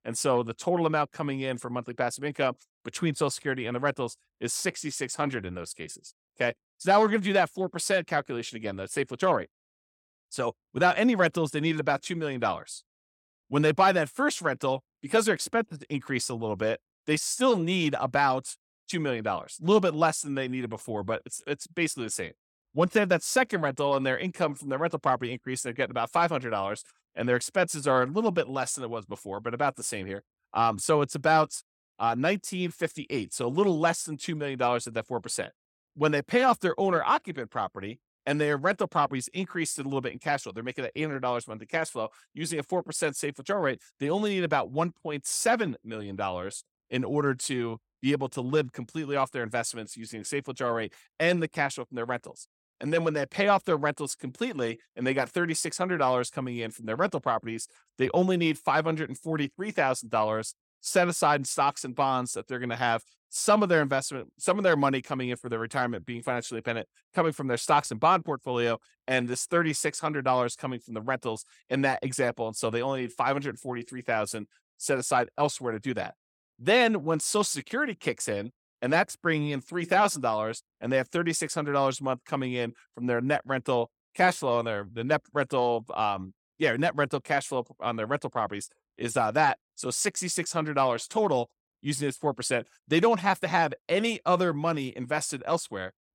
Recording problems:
none

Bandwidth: 17 kHz